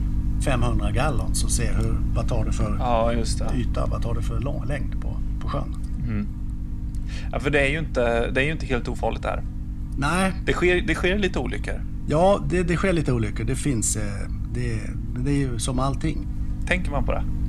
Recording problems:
electrical hum; noticeable; throughout; 50 Hz, 15 dB below the speech

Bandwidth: 14.5 kHz